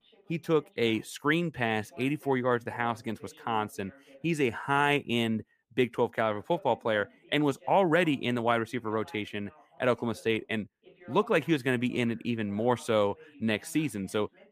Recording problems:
voice in the background; faint; throughout; 25 dB below the speech

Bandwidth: 15 kHz